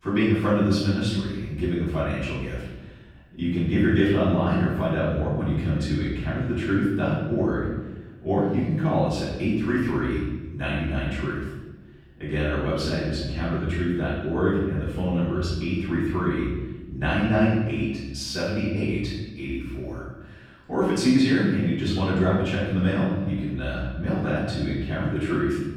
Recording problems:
room echo; strong; dies away in 1.1 s
off-mic speech; far

